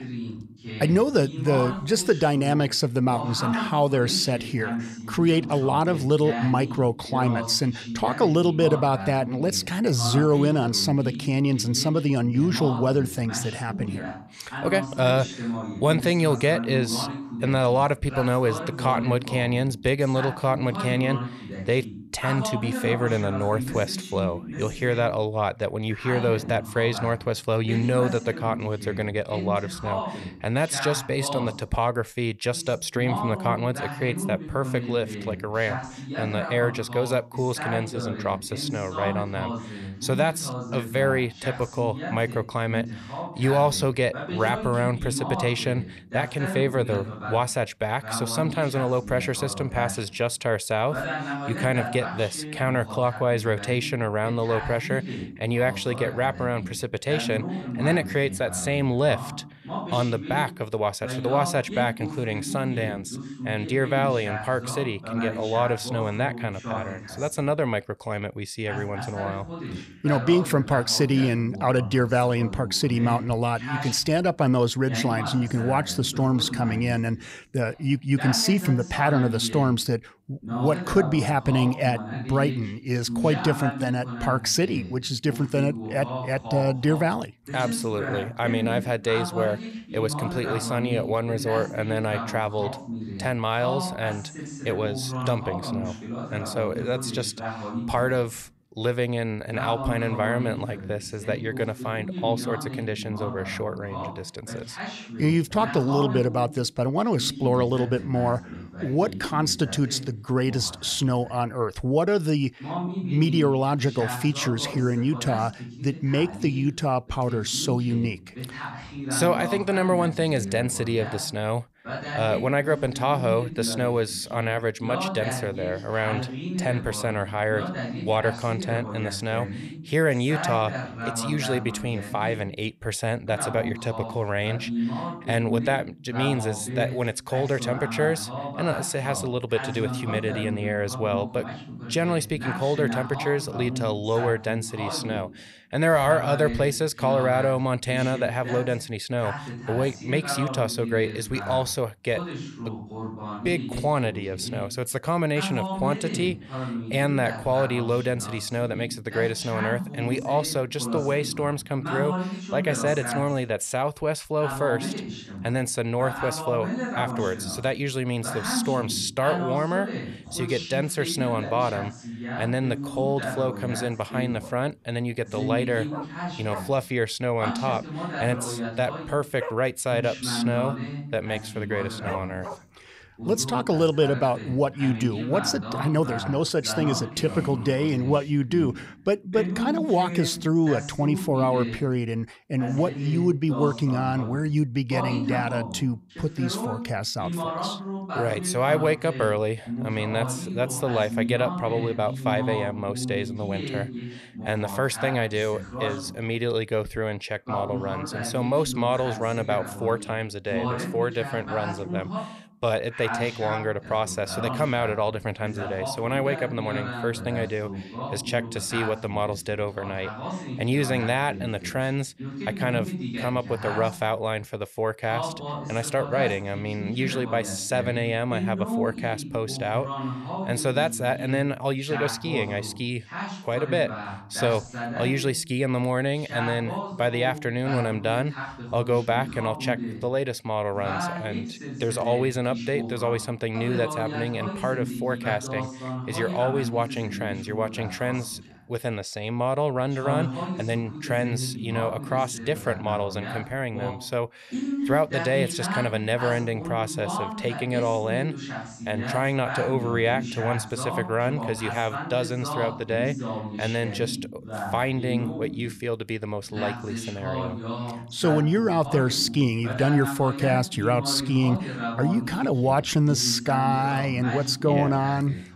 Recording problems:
voice in the background; loud; throughout; 8 dB below the speech
dog barking; noticeable; from 2:54 to 3:03; peak 10 dB below the speech

